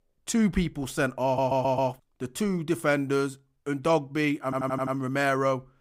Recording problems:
audio stuttering; at 1.5 s and at 4.5 s

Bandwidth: 15.5 kHz